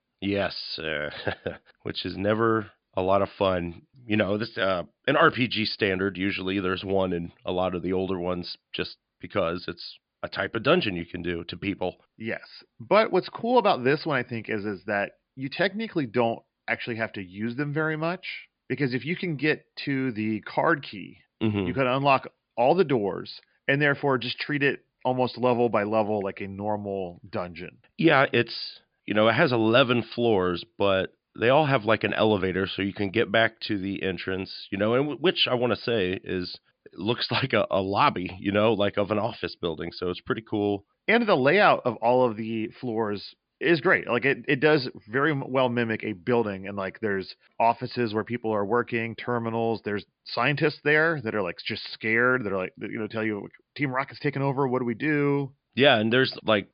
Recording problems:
high frequencies cut off; severe; nothing above 5 kHz

